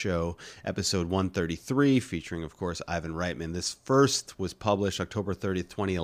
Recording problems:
abrupt cut into speech; at the start and the end

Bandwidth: 15 kHz